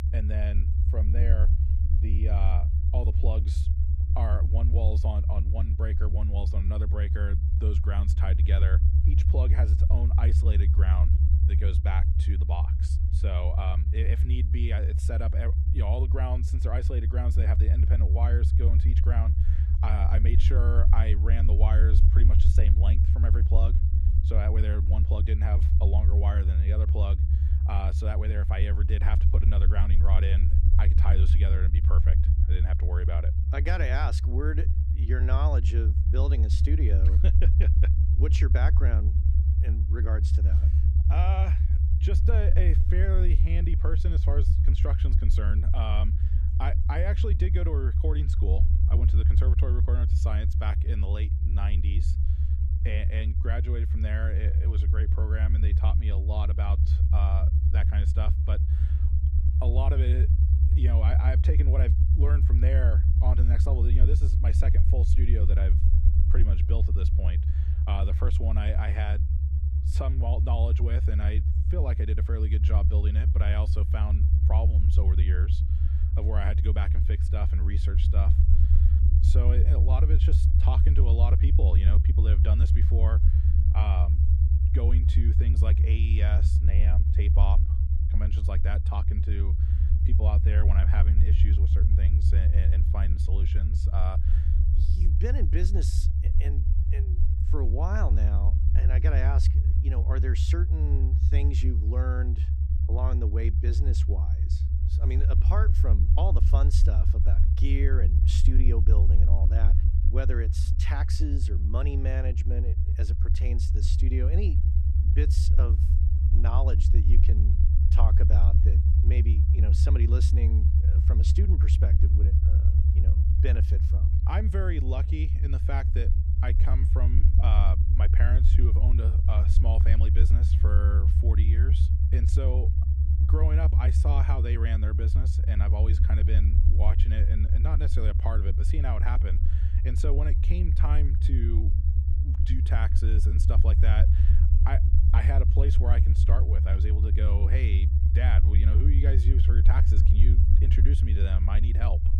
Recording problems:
low rumble; loud; throughout; 2 dB below the speech

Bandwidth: 15 kHz